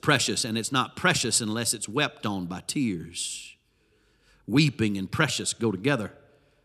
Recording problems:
none

